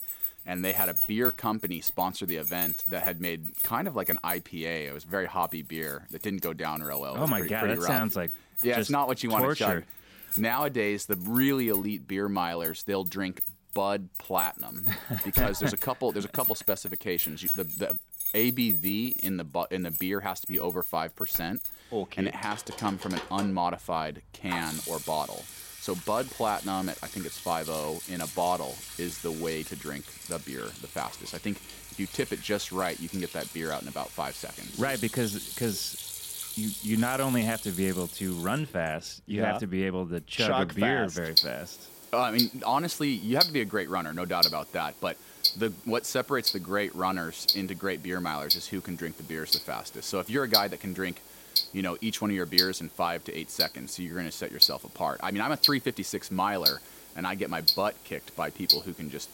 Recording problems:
household noises; very loud; throughout; 2 dB above the speech

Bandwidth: 16 kHz